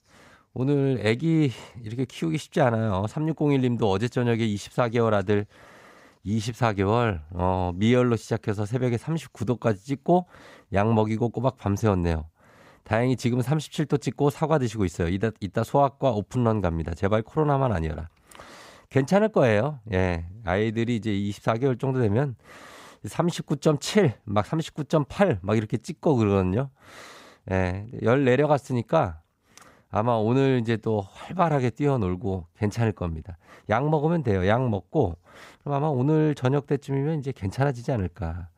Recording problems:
none

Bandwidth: 15.5 kHz